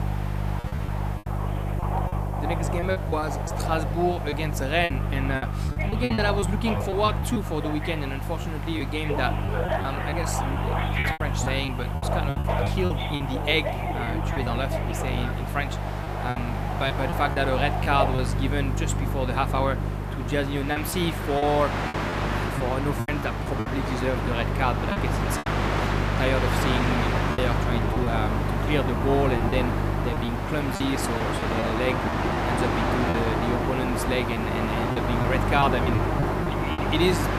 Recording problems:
train or aircraft noise; loud; throughout; 2 dB below the speech
electrical hum; noticeable; throughout; 50 Hz, 15 dB below the speech
hiss; faint; throughout; 25 dB below the speech
choppy; very; 7% of the speech affected

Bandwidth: 14.5 kHz